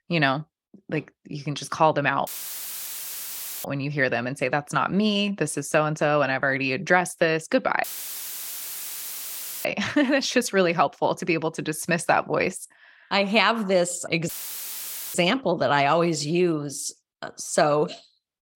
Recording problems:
audio cutting out; filled with static; at 2.5 s for 1.5 s, at 8 s for 2 s and at 14 s for 1 s

